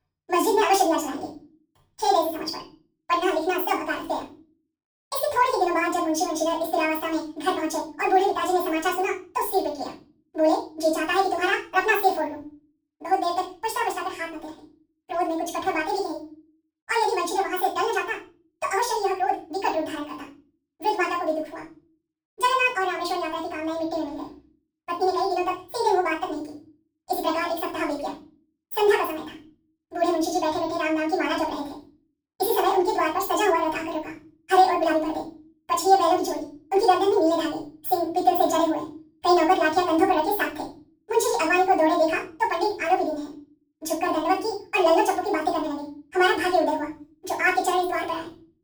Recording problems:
off-mic speech; far
wrong speed and pitch; too fast and too high; 1.7 times normal speed
room echo; slight; dies away in 0.3 s

